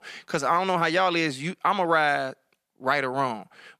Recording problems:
none

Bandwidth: 14.5 kHz